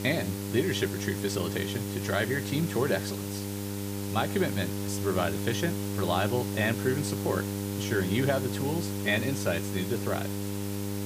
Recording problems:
electrical hum; loud; throughout; 50 Hz, 8 dB below the speech
hiss; loud; throughout; 9 dB below the speech

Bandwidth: 15 kHz